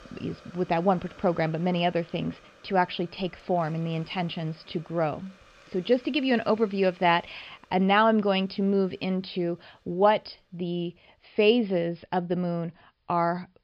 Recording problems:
high frequencies cut off; noticeable; nothing above 5.5 kHz
hiss; faint; throughout; 25 dB below the speech

